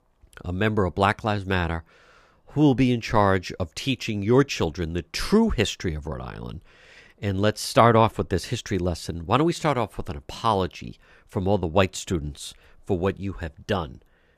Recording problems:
none

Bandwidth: 14.5 kHz